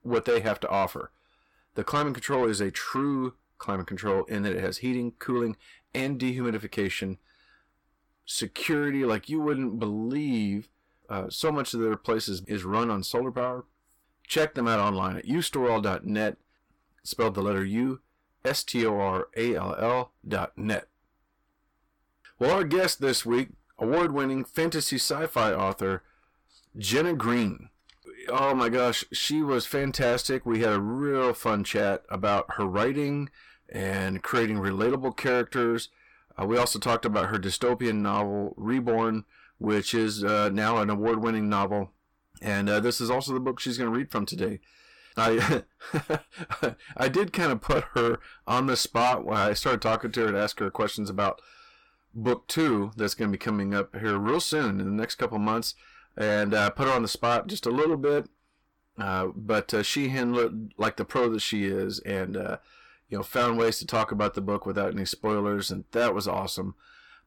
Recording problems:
distortion; heavy; 8 dB below the speech

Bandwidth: 17 kHz